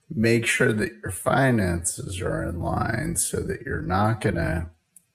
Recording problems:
wrong speed, natural pitch; too slow; 0.6 times normal speed

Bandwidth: 14.5 kHz